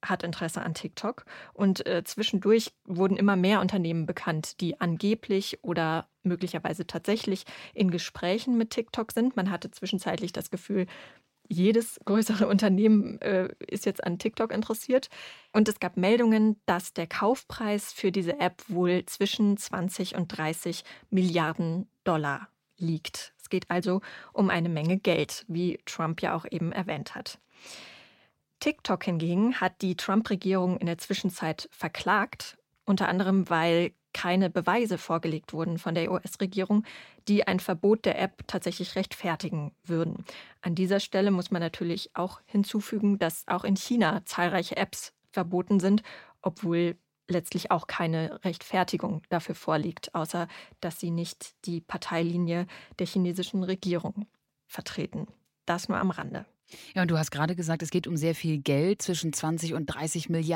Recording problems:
abrupt cut into speech; at the end

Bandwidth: 16.5 kHz